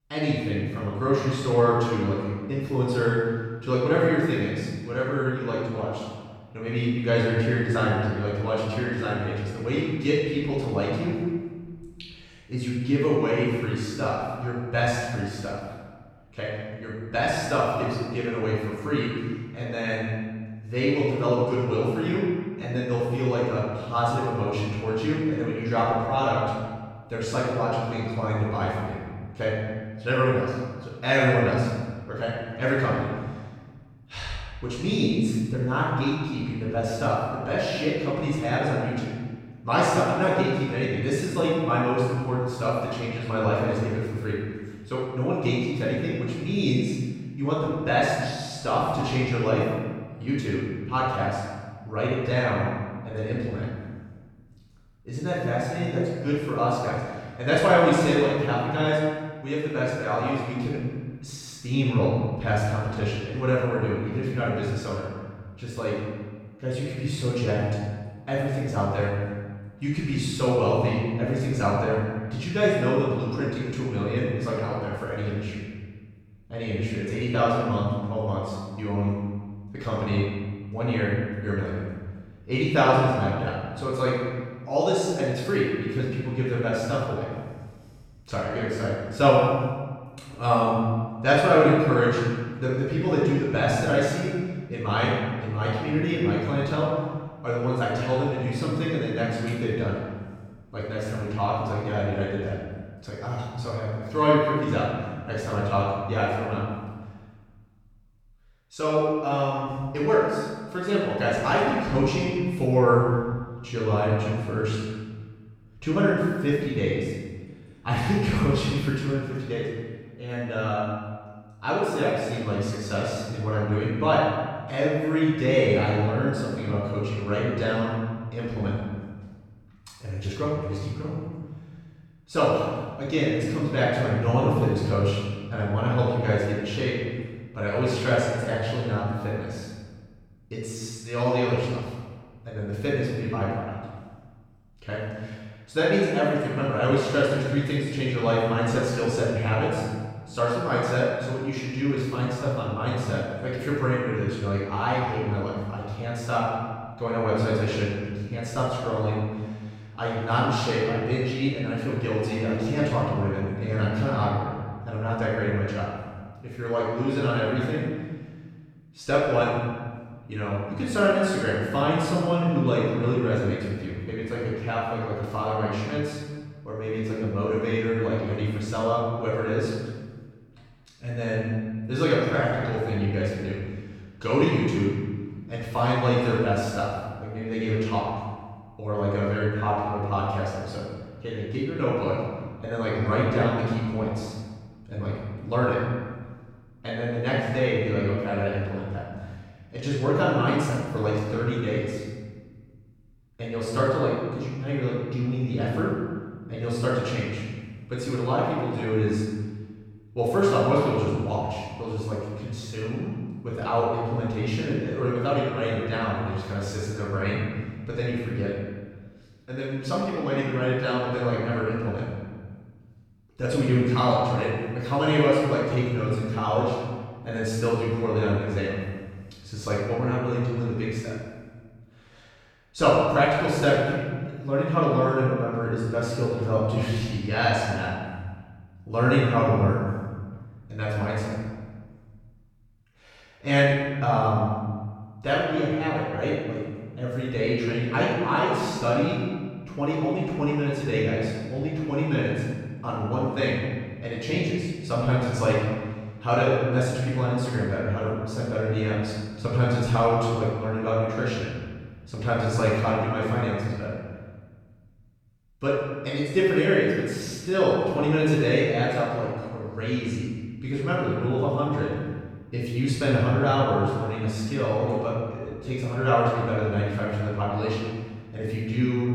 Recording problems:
room echo; strong; dies away in 1.4 s
off-mic speech; far

